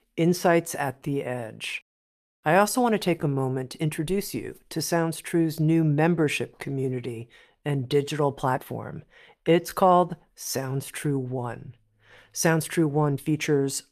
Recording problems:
uneven, jittery; strongly; from 1 to 13 s

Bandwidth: 14.5 kHz